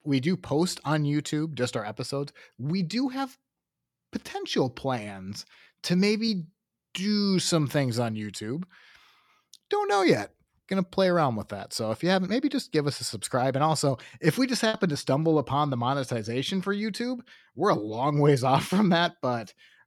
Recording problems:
choppy; occasionally; at 15 s; 3% of the speech affected

